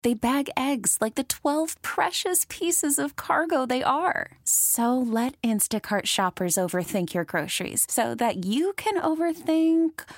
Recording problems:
none

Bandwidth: 16 kHz